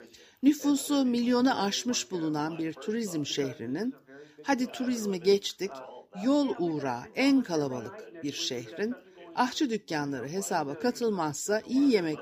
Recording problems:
background chatter; noticeable; throughout; 2 voices, 20 dB below the speech

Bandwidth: 15 kHz